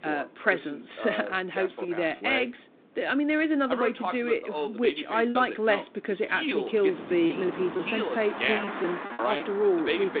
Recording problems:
phone-call audio
voice in the background; loud; throughout; 5 dB below the speech
traffic noise; noticeable; throughout; 10 dB below the speech
wind noise on the microphone; occasional gusts; 20 dB below the speech
choppy; occasionally; 3% of the speech affected

